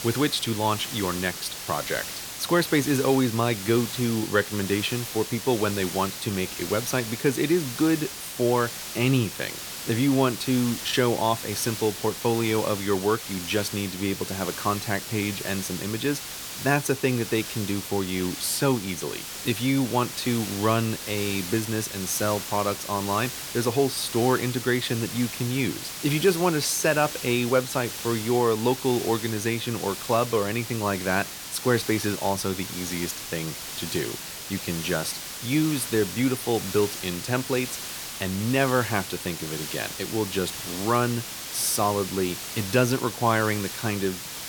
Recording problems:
hiss; loud; throughout; 7 dB below the speech

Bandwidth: 18.5 kHz